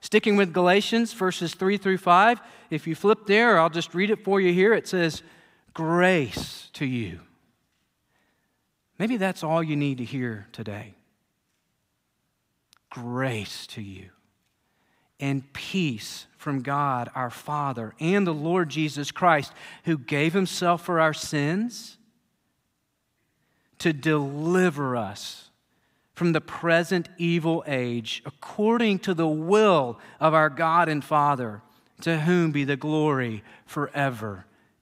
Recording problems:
none

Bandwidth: 15.5 kHz